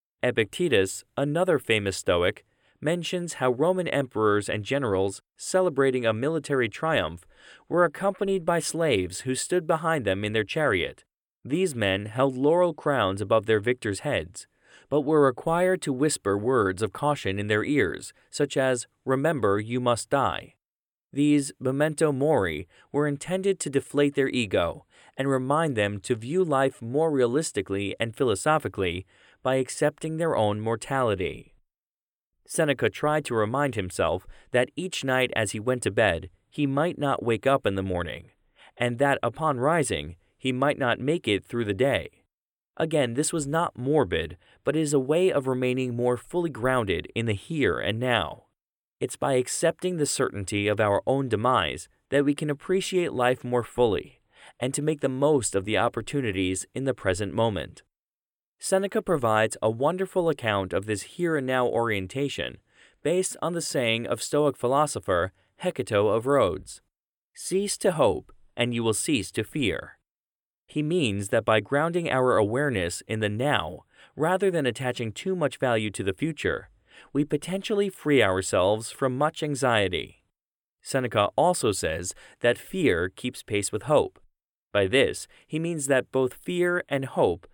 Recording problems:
none

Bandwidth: 17 kHz